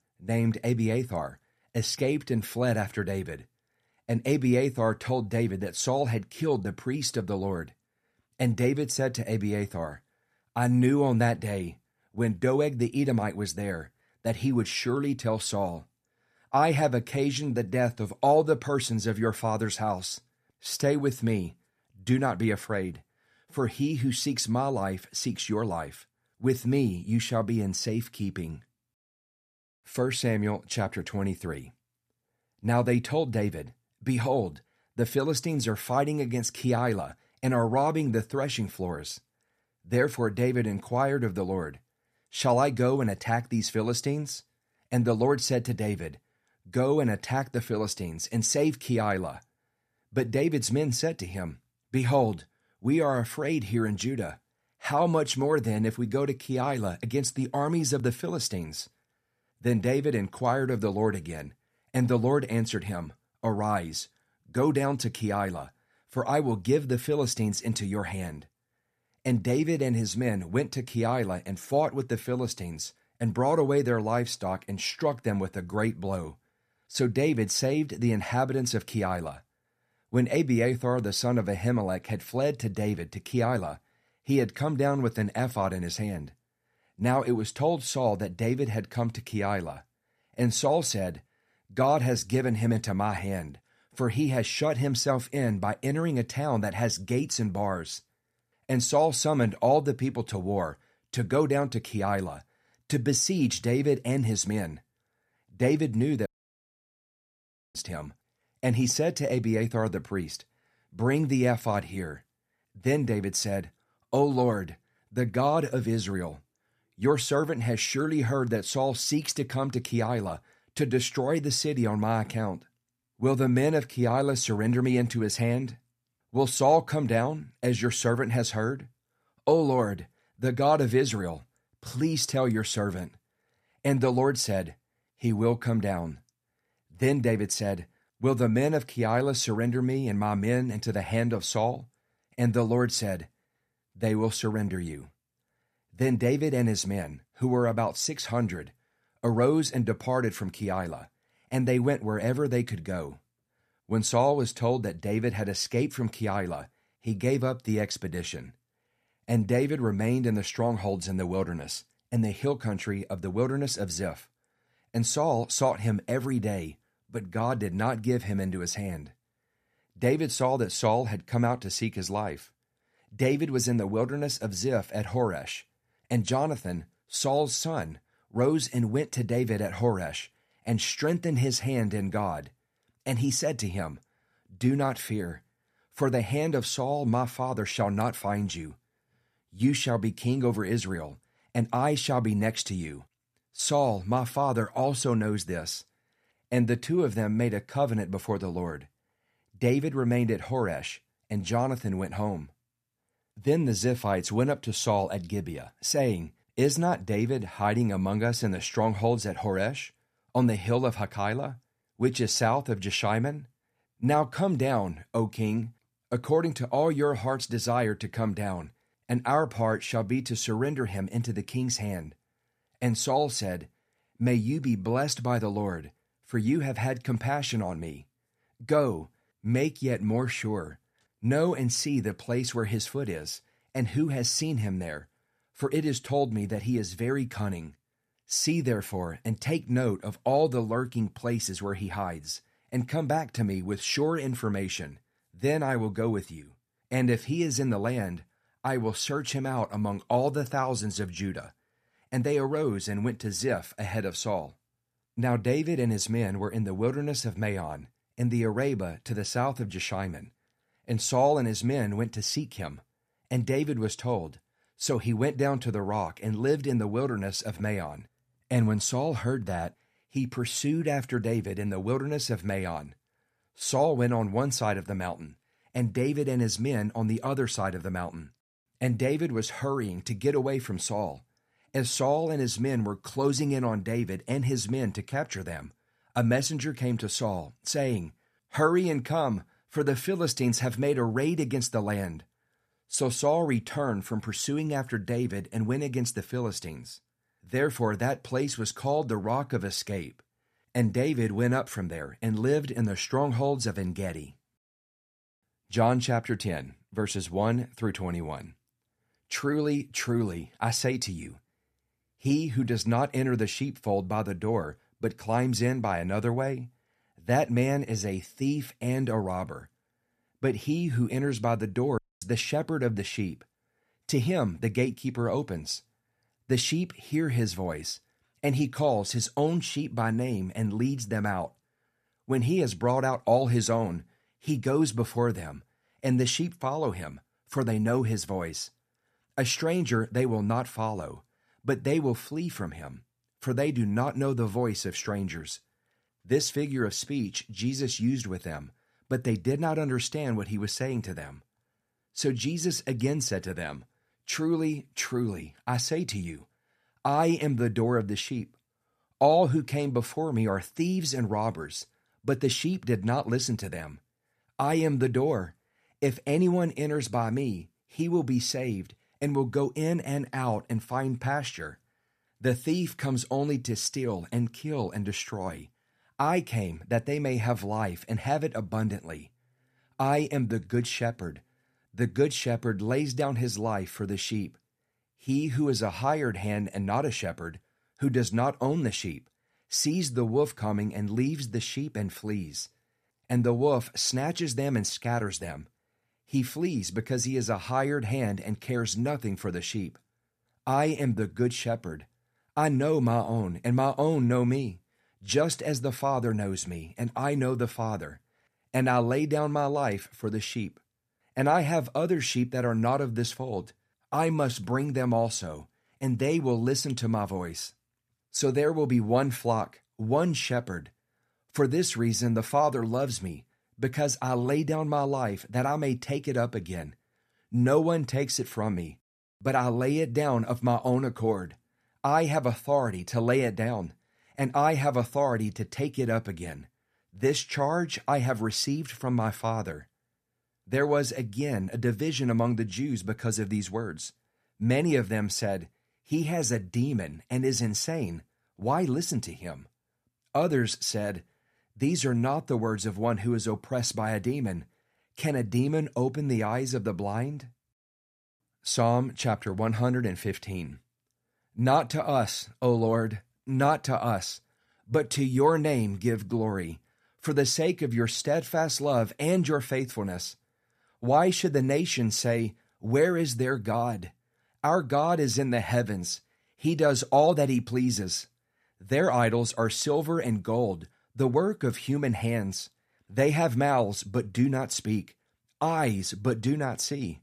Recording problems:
audio cutting out; at 1:46 for 1.5 s and at 5:22

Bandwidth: 14.5 kHz